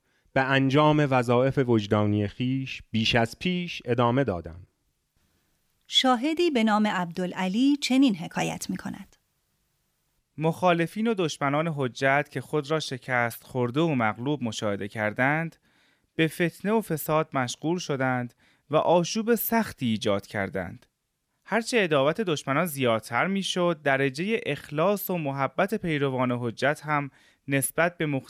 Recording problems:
none

